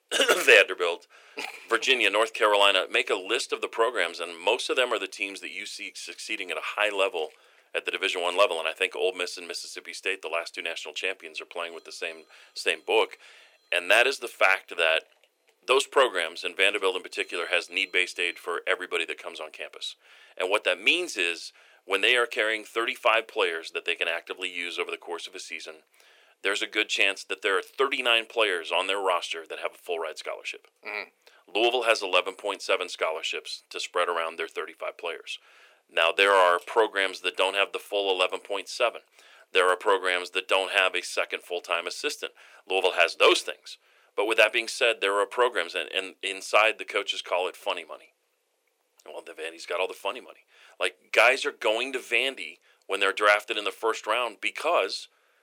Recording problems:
thin; very; fading below 400 Hz

